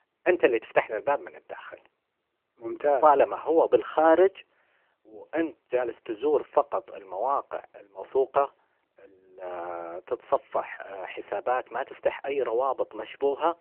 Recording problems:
phone-call audio

